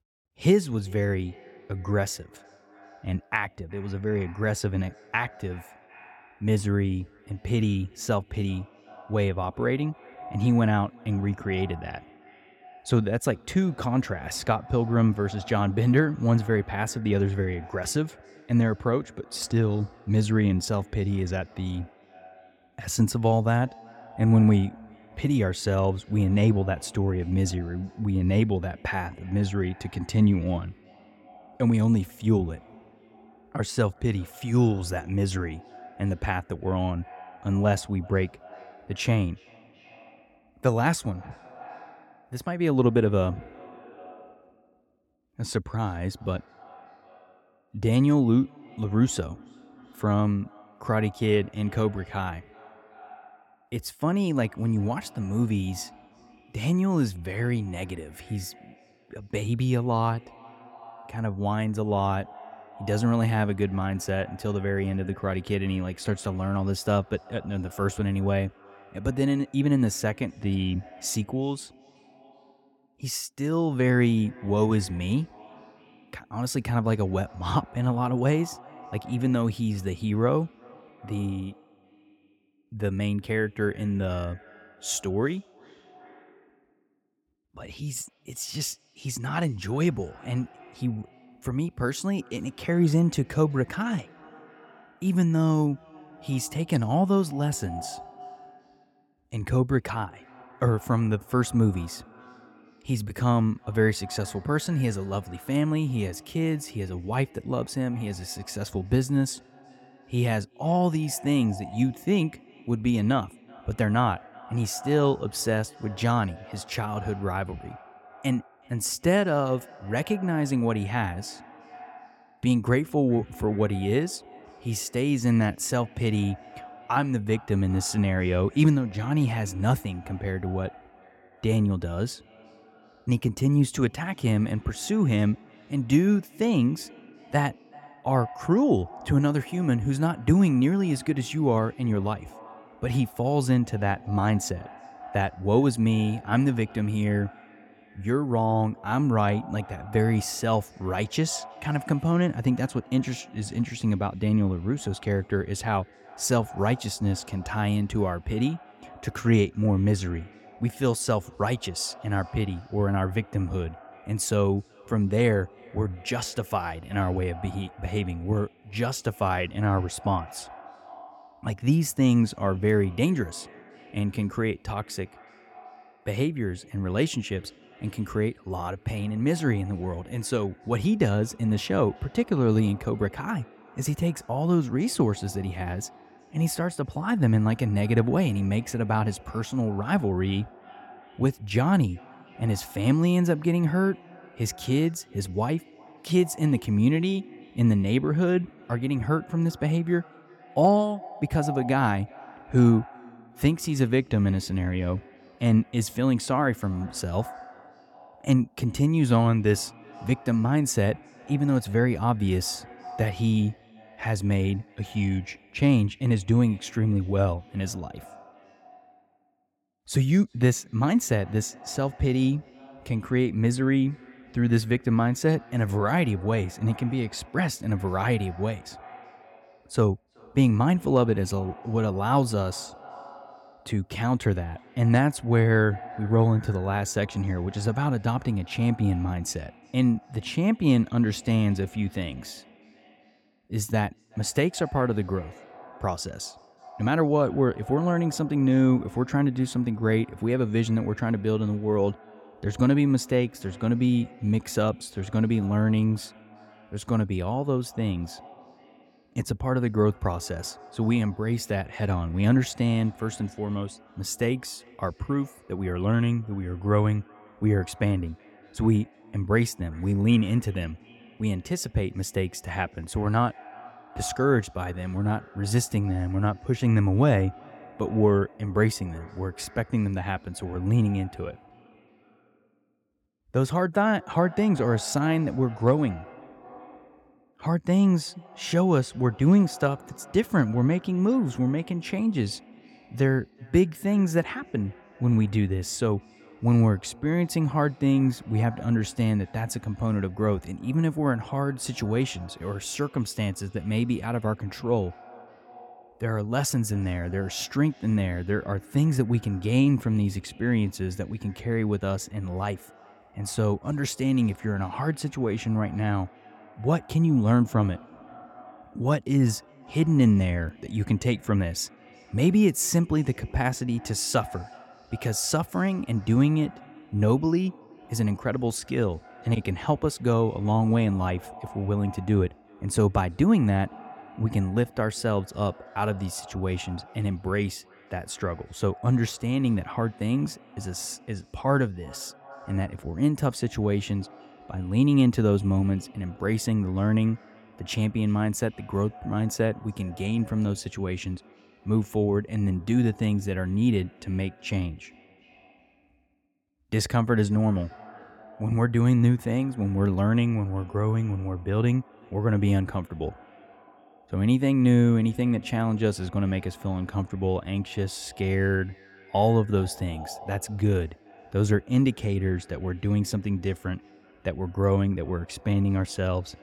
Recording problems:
echo of what is said; faint; throughout; 380 ms later, 20 dB below the speech

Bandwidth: 17 kHz